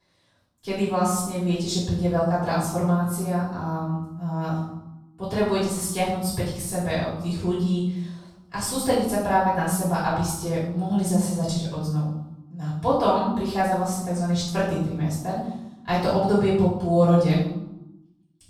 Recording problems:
off-mic speech; far
room echo; noticeable; dies away in 0.8 s

